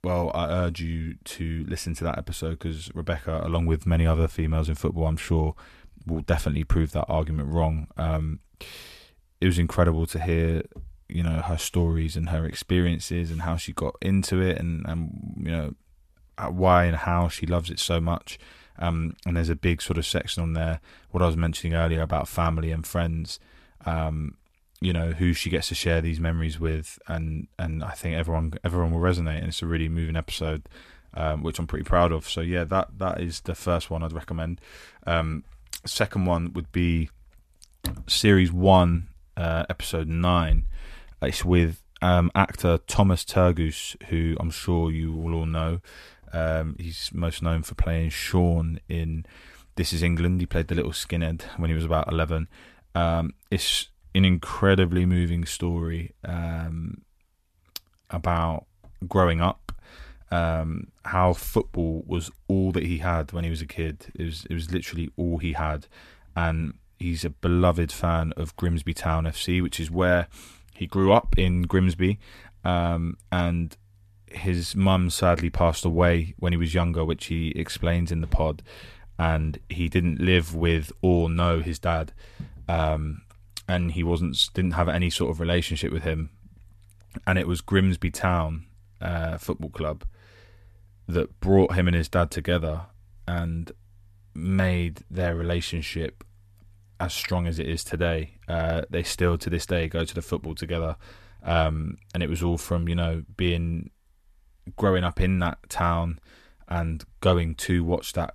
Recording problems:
none

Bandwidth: 14 kHz